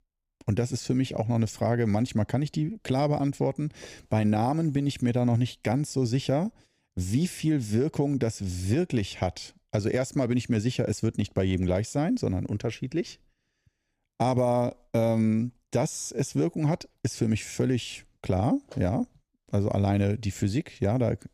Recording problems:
none

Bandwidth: 15 kHz